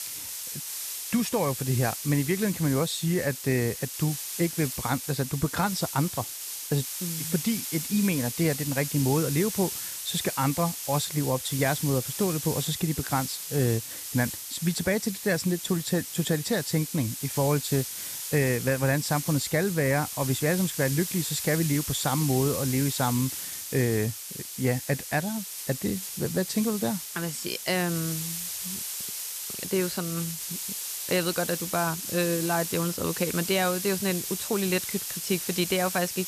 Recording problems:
hiss; loud; throughout; 5 dB below the speech

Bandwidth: 14.5 kHz